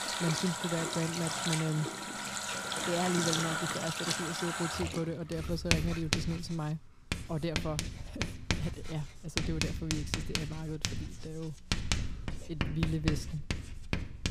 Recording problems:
household noises; very loud; throughout; 2 dB above the speech

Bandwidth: 15.5 kHz